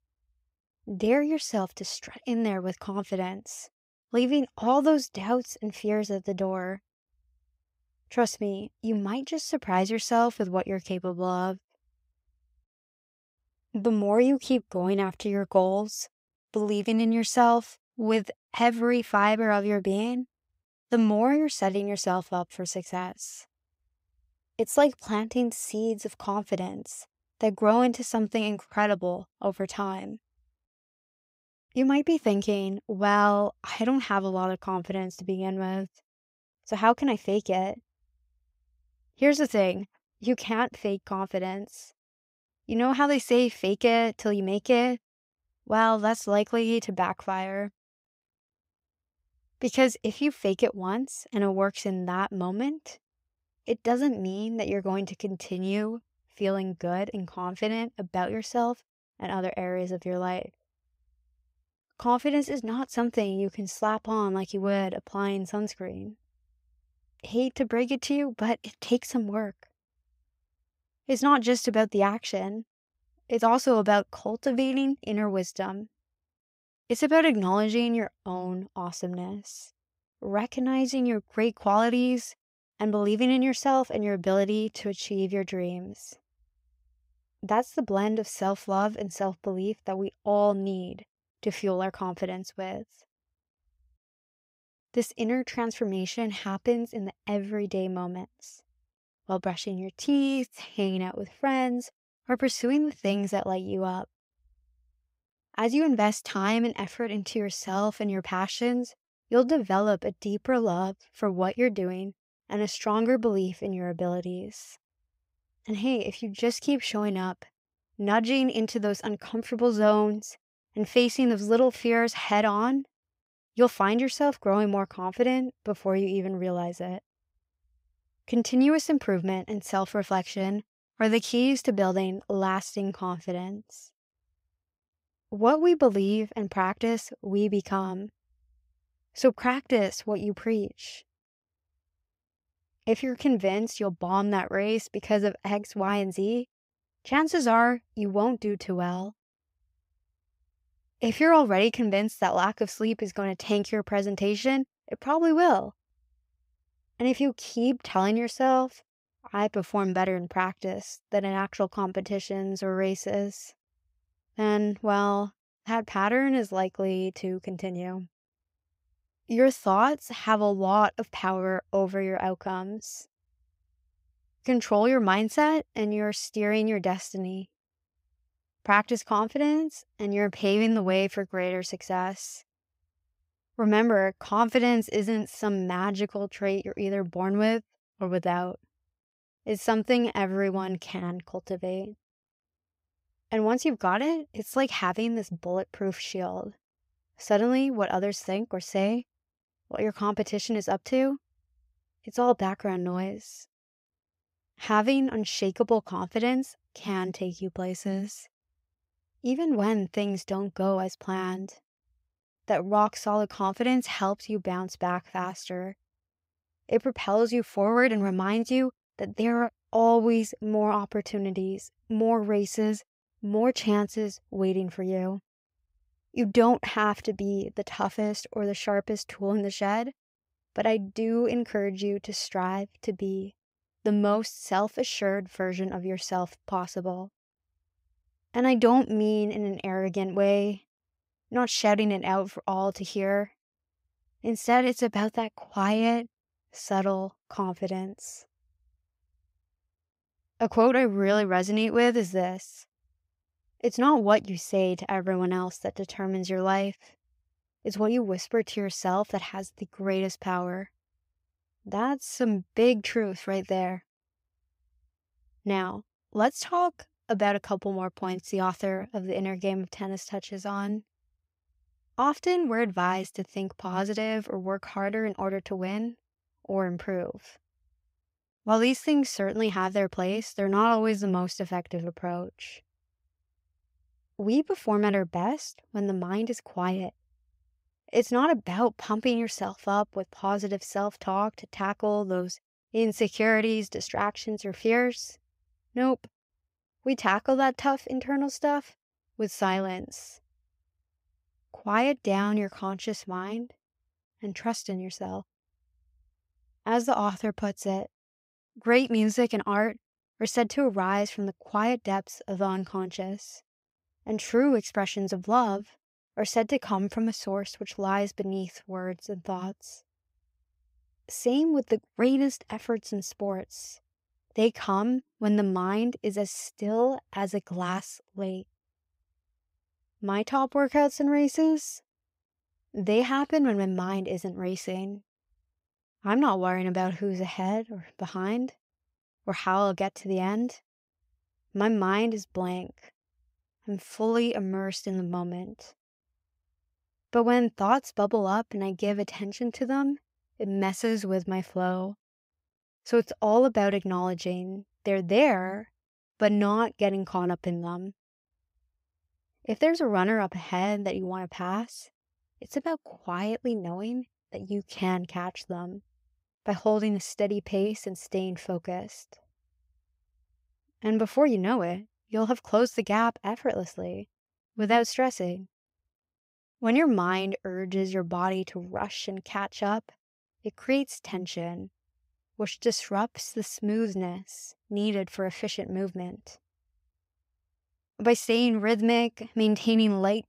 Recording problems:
none

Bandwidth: 15.5 kHz